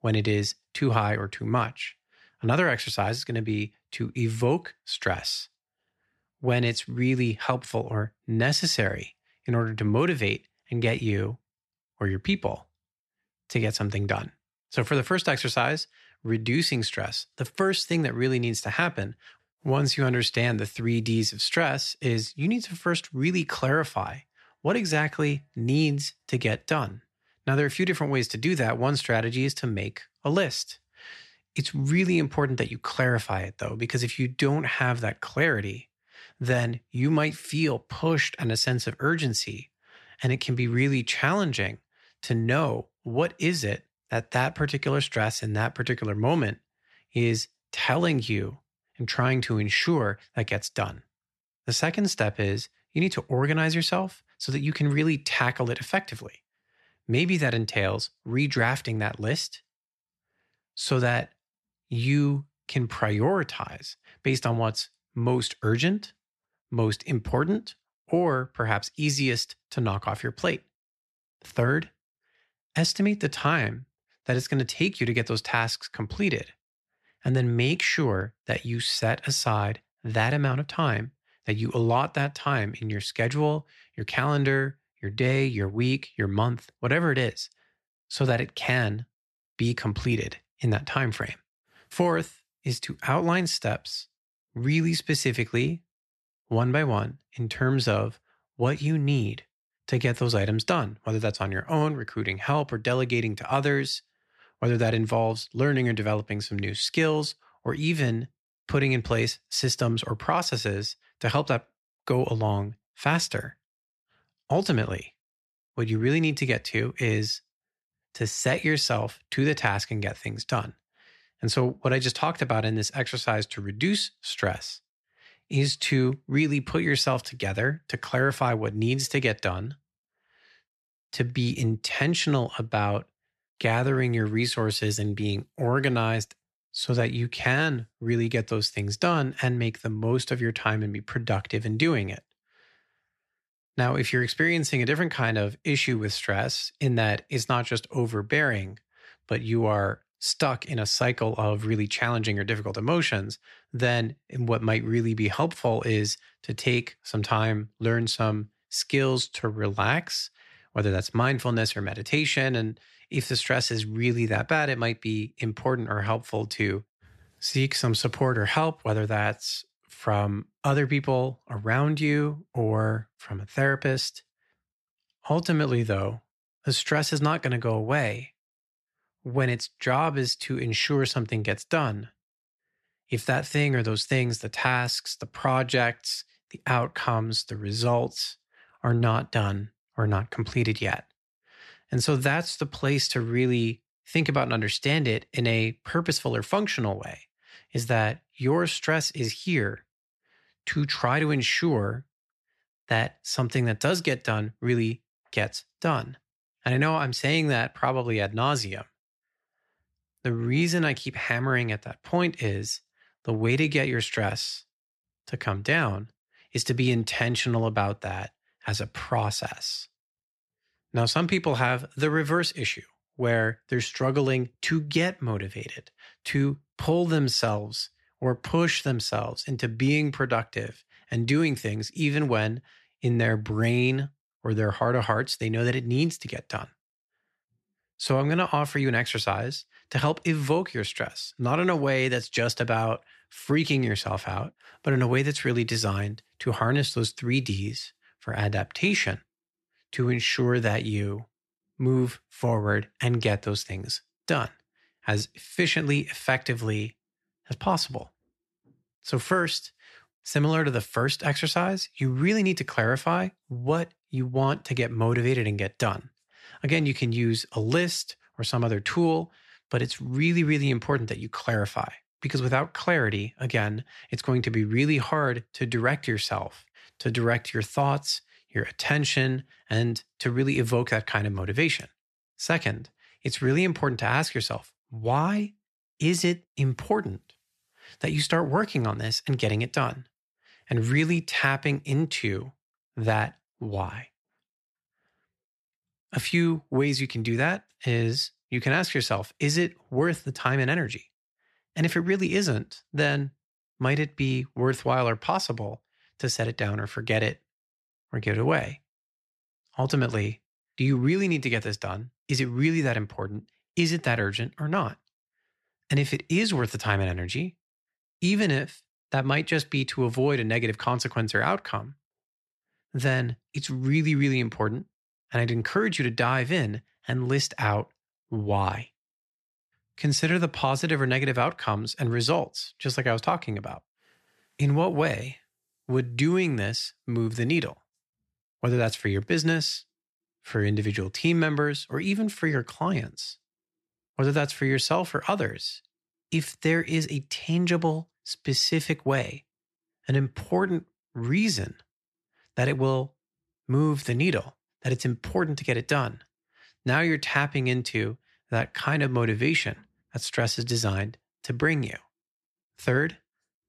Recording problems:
none

